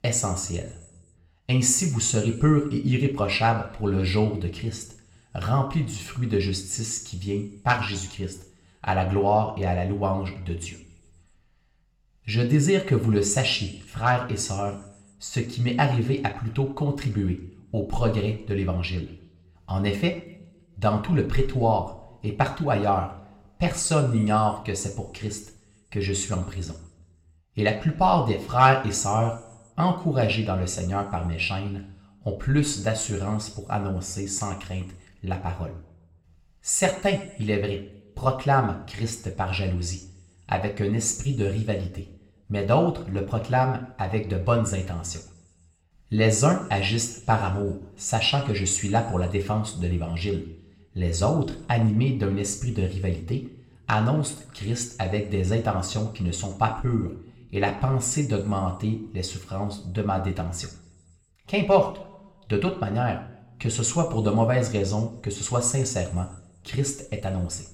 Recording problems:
room echo; slight; dies away in 0.5 s
off-mic speech; somewhat distant

